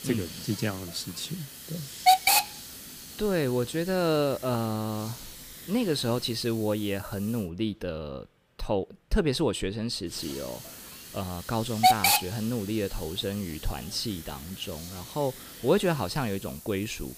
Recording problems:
hiss; very loud; until 7.5 s and from 10 s on; 3 dB above the speech

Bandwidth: 15 kHz